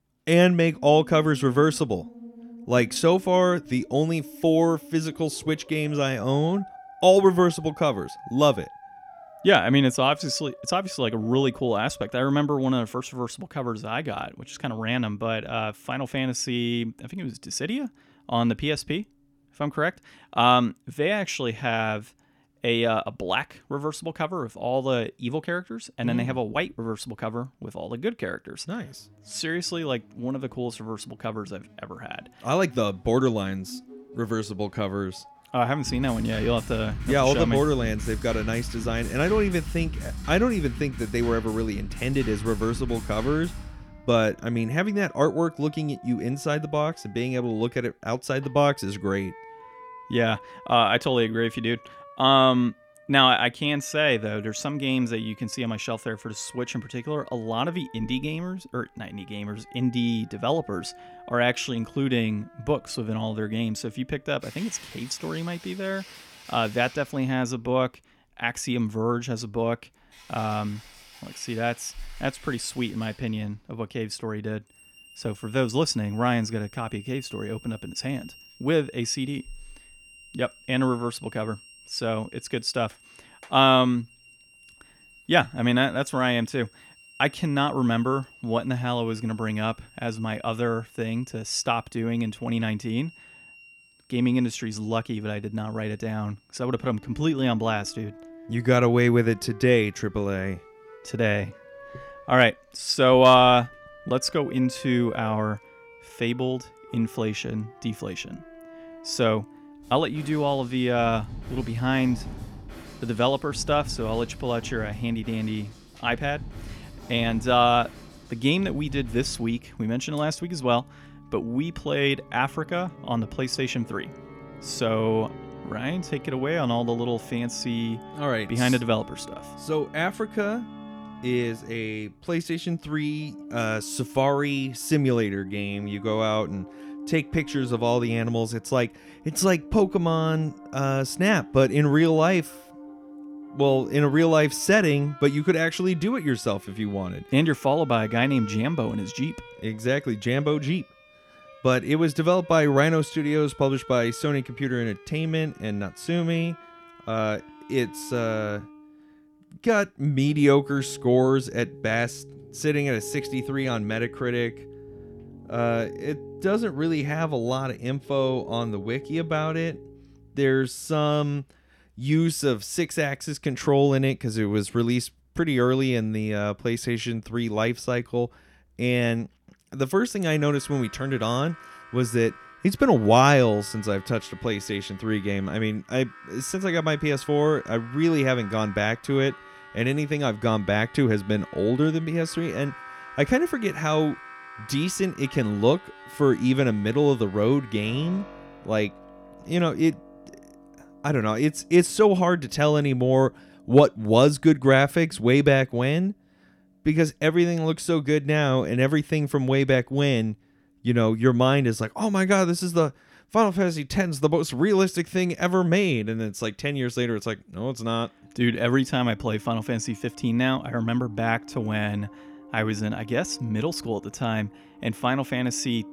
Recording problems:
background music; noticeable; throughout; 20 dB below the speech

